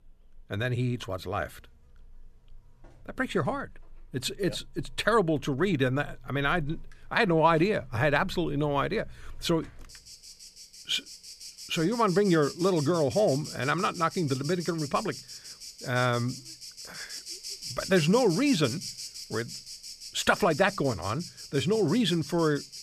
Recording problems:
animal sounds; noticeable; throughout; 15 dB below the speech

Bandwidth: 14.5 kHz